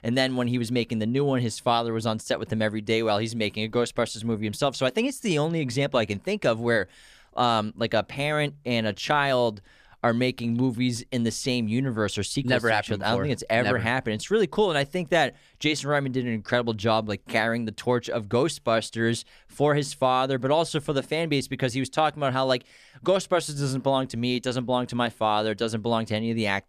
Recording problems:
none

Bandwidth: 14.5 kHz